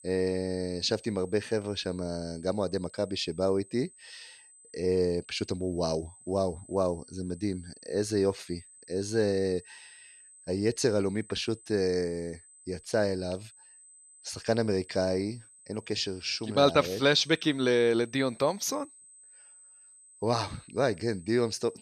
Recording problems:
high-pitched whine; faint; throughout; 8 kHz, 25 dB below the speech

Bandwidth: 13.5 kHz